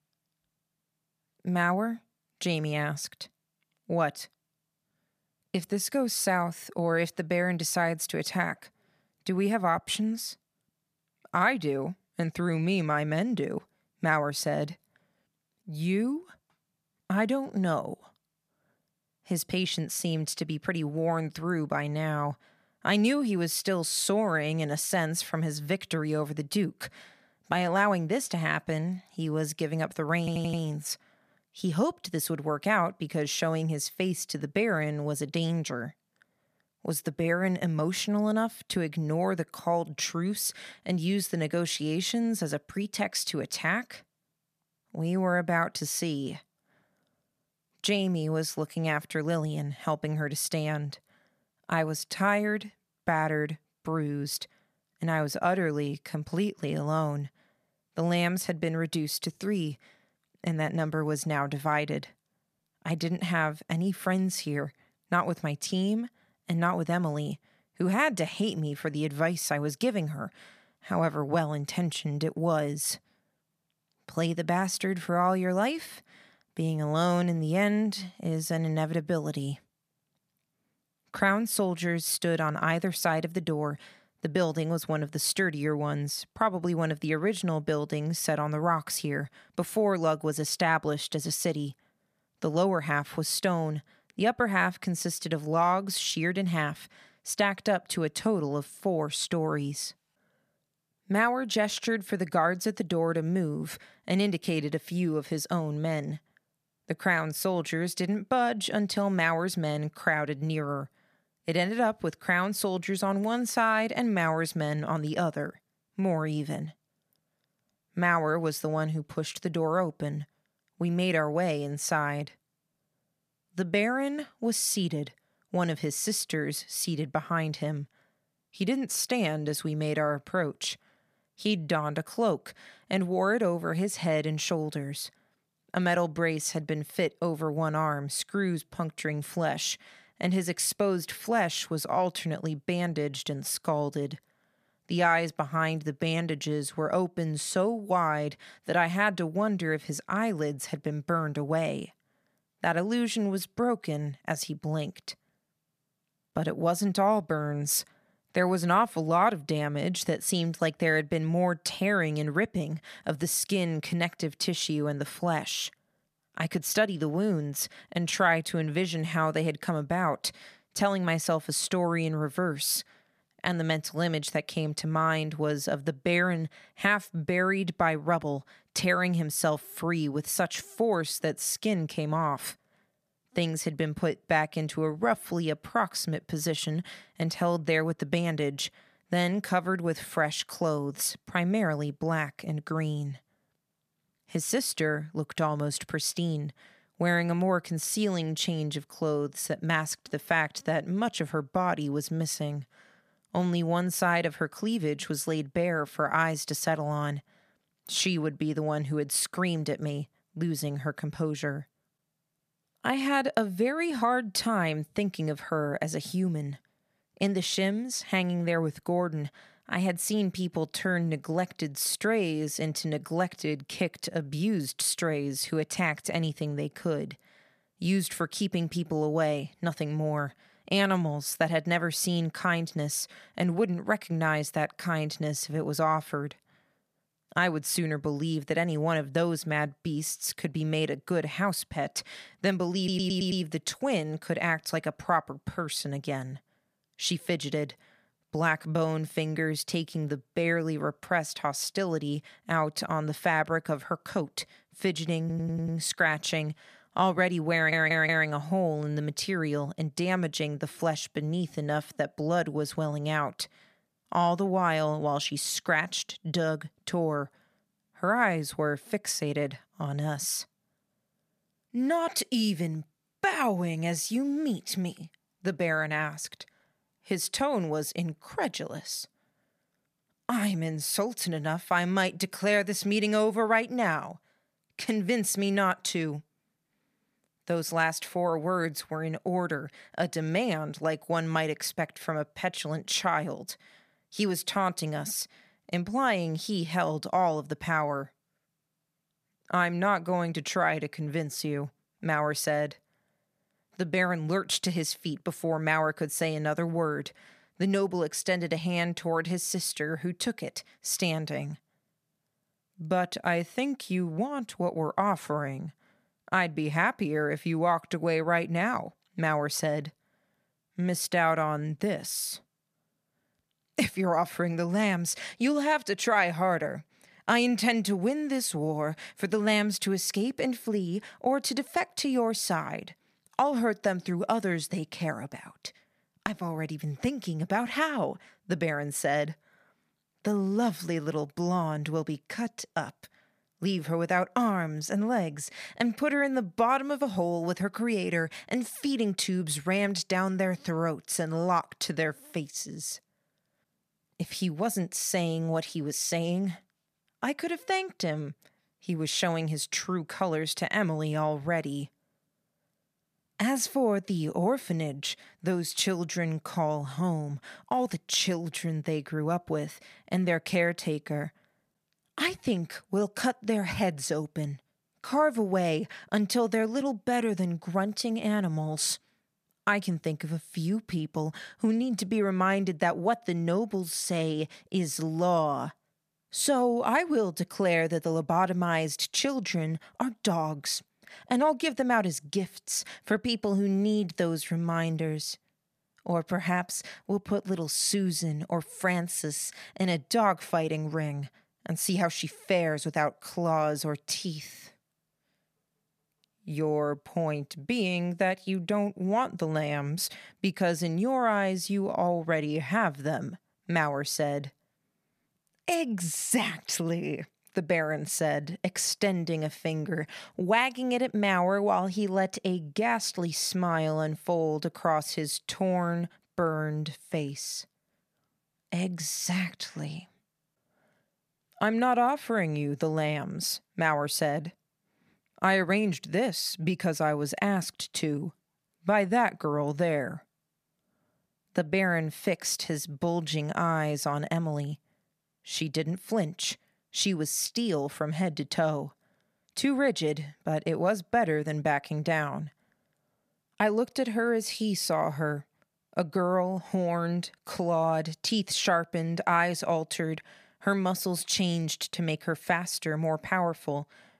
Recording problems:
audio stuttering; 4 times, first at 30 s

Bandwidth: 14.5 kHz